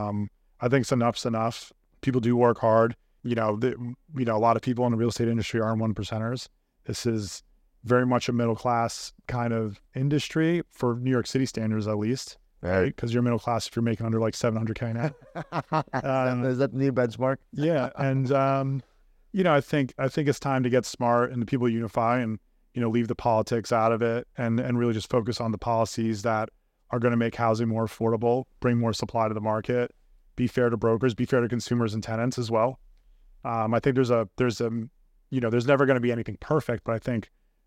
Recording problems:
abrupt cut into speech; at the start

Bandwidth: 16 kHz